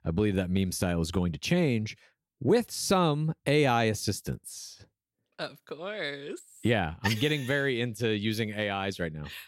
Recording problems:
none

